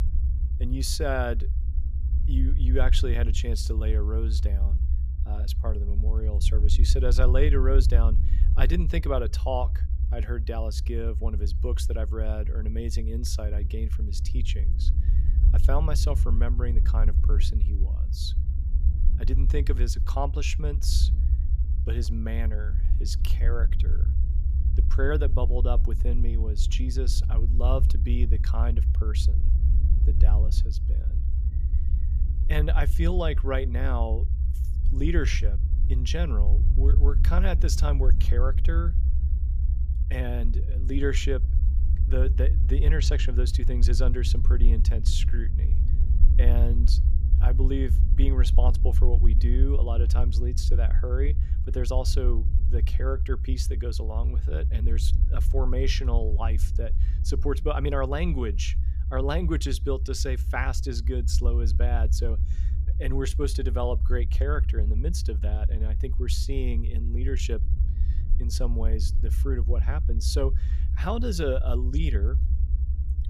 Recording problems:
low rumble; noticeable; throughout; 10 dB below the speech

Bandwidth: 15 kHz